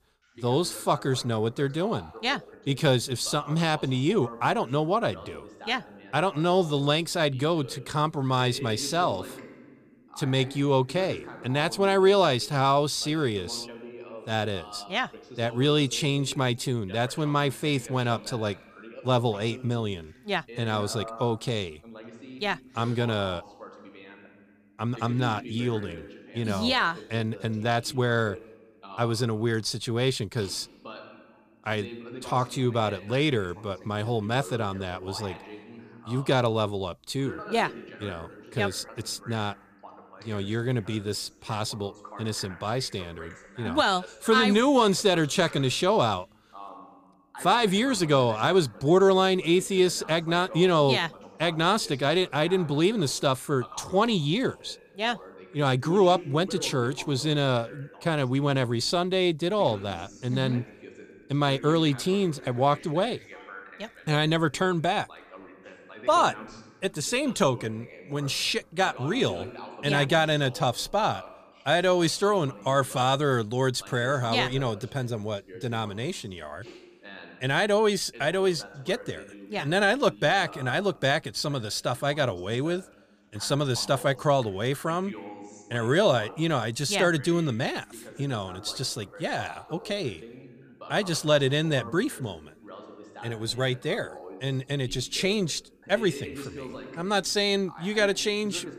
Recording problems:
voice in the background; noticeable; throughout; 20 dB below the speech

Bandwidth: 15 kHz